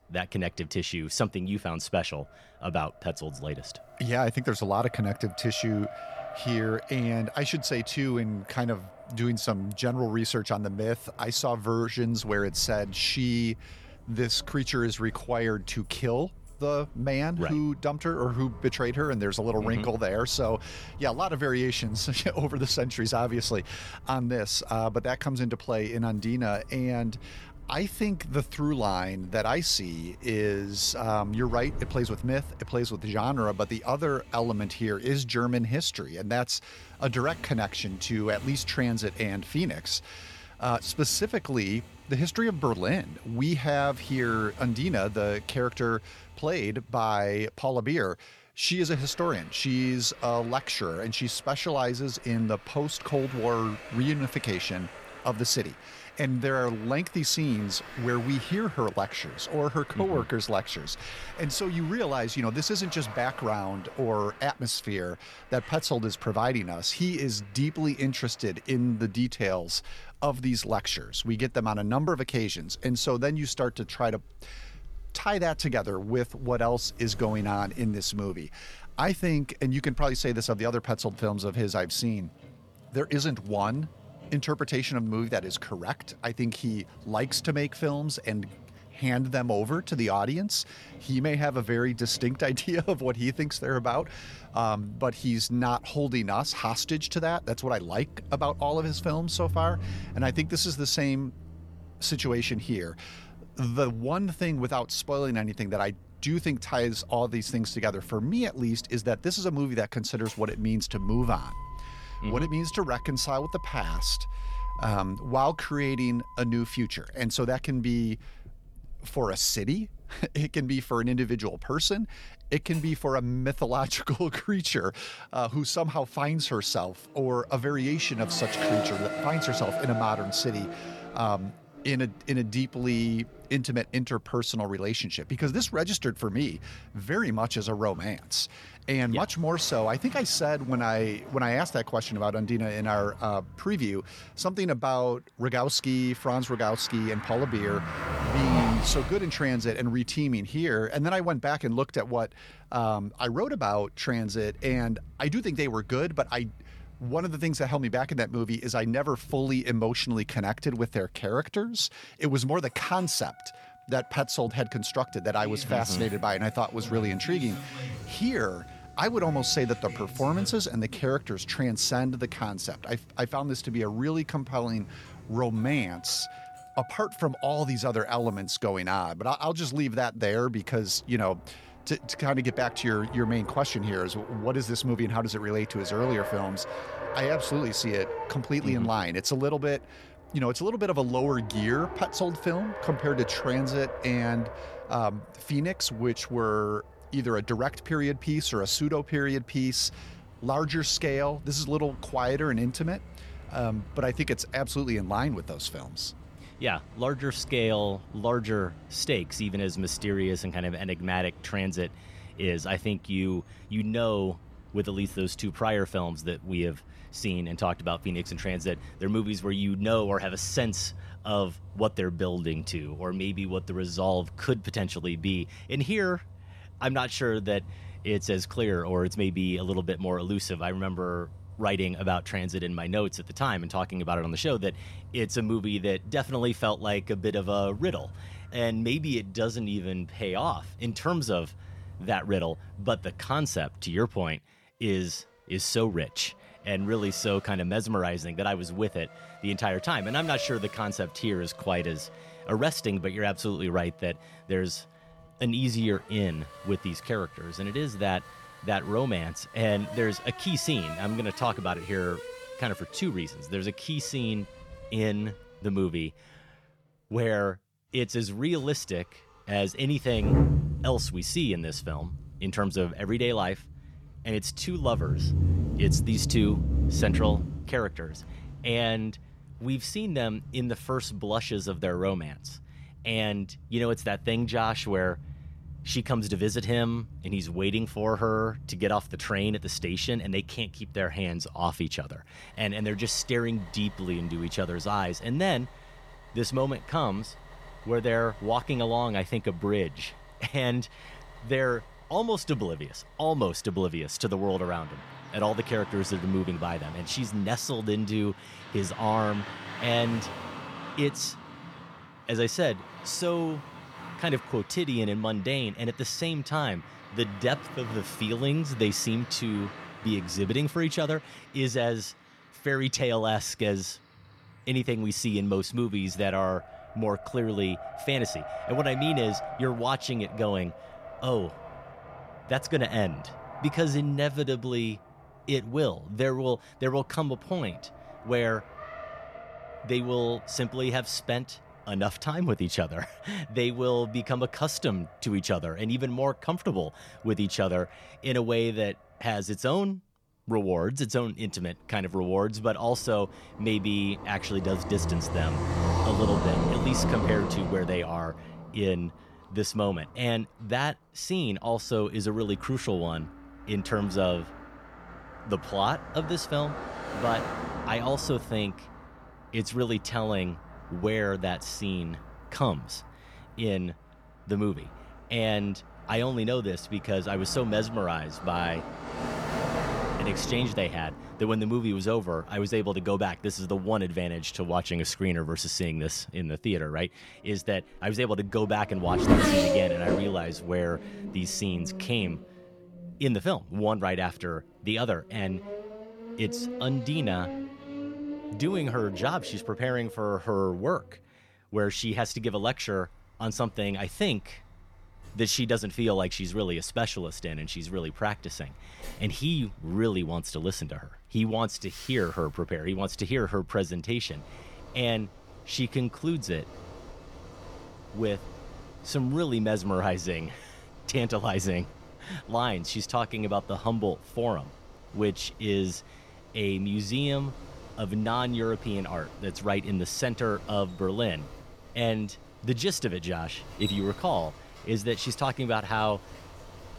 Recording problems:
traffic noise; noticeable; throughout; 10 dB below the speech

